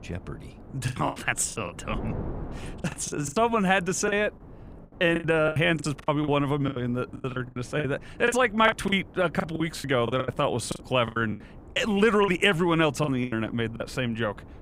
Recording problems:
wind noise on the microphone; occasional gusts; 25 dB below the speech
choppy; very; 16% of the speech affected

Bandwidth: 15.5 kHz